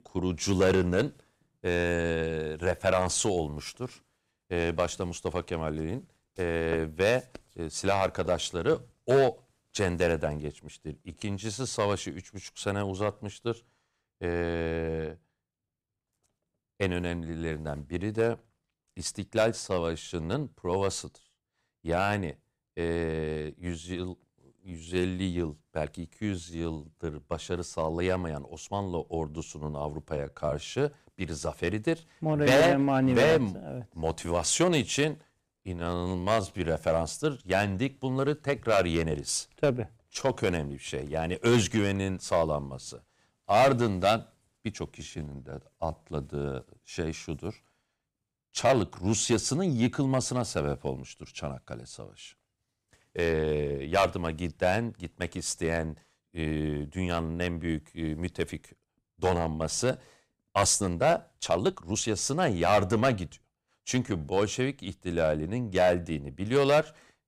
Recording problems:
distortion; slight; 1.6% of the sound clipped
uneven, jittery; strongly; from 4.5 s to 1:04

